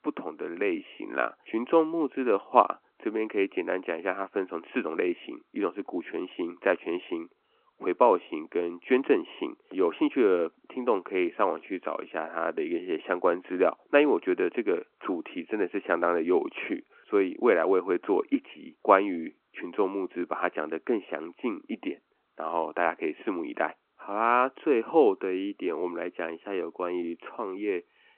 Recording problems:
phone-call audio

